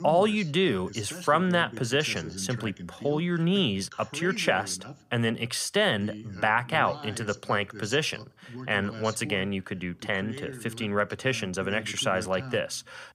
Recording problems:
voice in the background; noticeable; throughout; 15 dB below the speech

